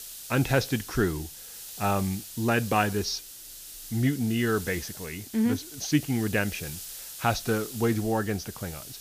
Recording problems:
high frequencies cut off; noticeable; nothing above 6.5 kHz
hiss; noticeable; throughout; 10 dB below the speech

